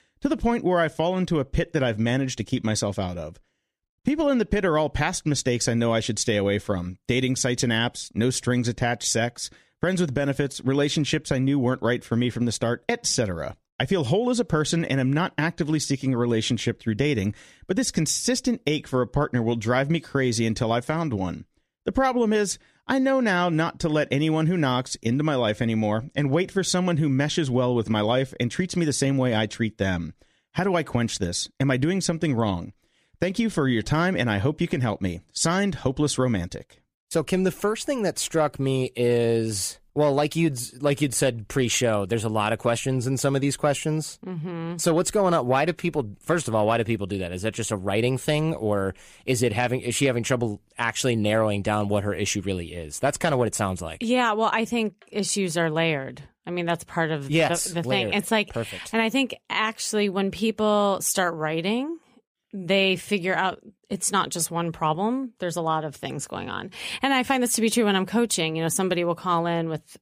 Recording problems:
none

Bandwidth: 15 kHz